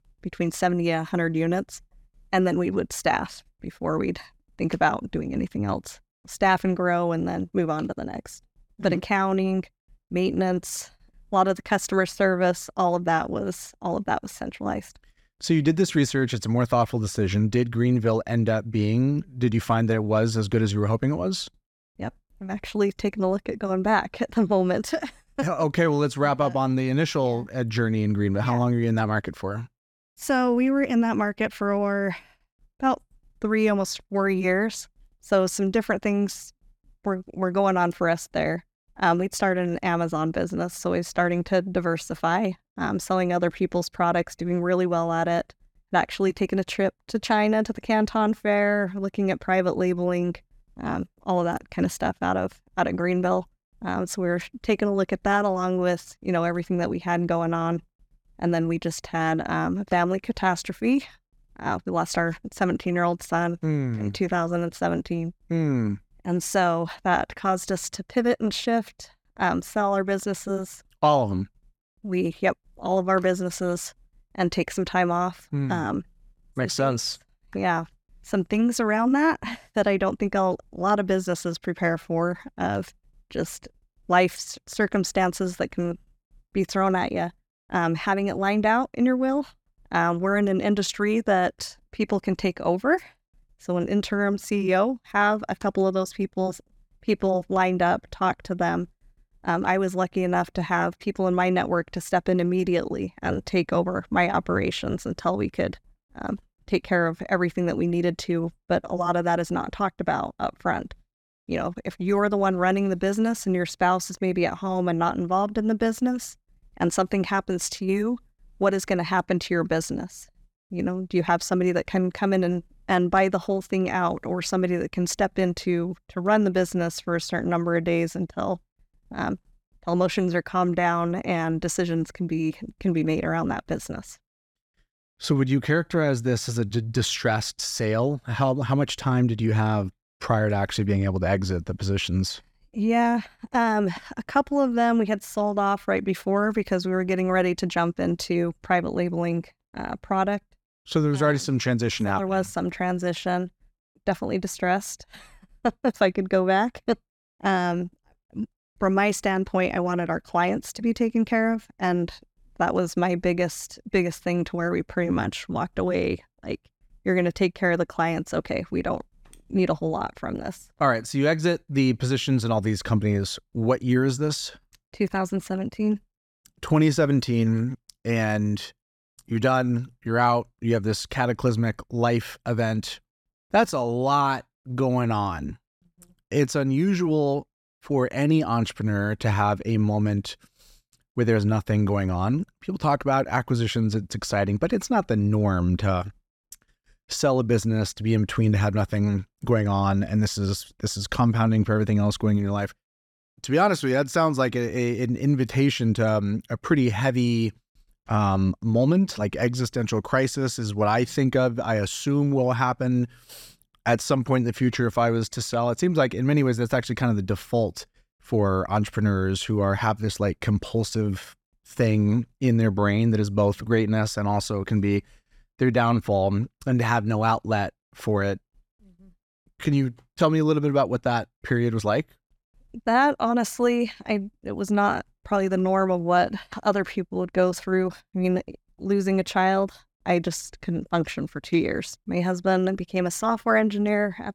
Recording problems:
none

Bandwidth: 17.5 kHz